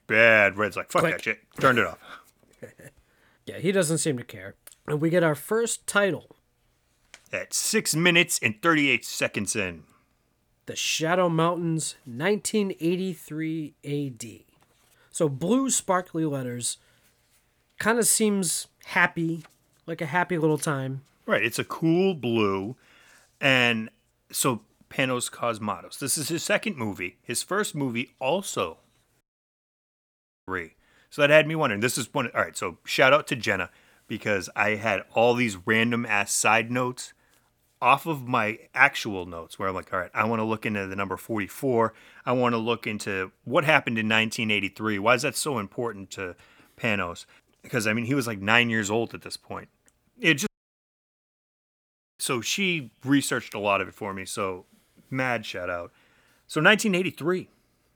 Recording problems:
audio cutting out; at 29 s for 1.5 s and at 50 s for 1.5 s

